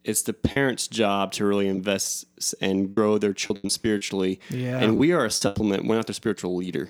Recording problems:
choppy; very; from 0.5 to 2 s, from 3 to 4 s and at 5 s; 10% of the speech affected

